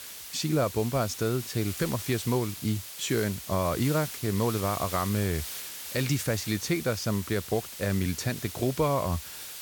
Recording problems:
hiss; loud; throughout; 8 dB below the speech

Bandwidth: 18 kHz